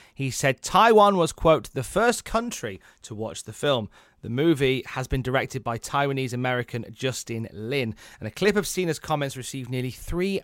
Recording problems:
none

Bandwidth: 16 kHz